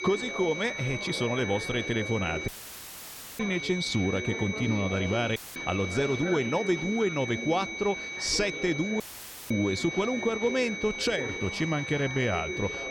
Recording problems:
high-pitched whine; loud; throughout; 2.5 kHz, 6 dB below the speech
chatter from many people; noticeable; throughout; 10 dB below the speech
audio cutting out; filled with static; at 2.5 s for 1 s, at 5.5 s and at 9 s for 0.5 s

